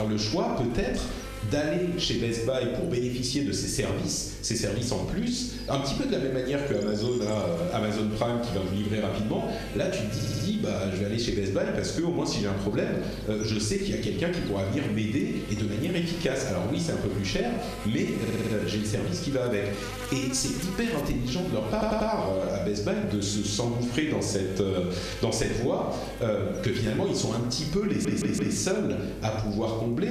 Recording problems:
room echo; noticeable; dies away in 0.6 s
off-mic speech; somewhat distant
squashed, flat; somewhat
electrical hum; noticeable; throughout; 50 Hz, 15 dB below the speech
abrupt cut into speech; at the start and the end
audio stuttering; 4 times, first at 10 s

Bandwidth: 14 kHz